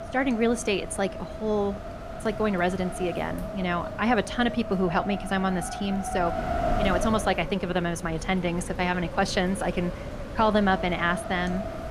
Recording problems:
wind noise on the microphone; heavy; 7 dB below the speech

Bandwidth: 14.5 kHz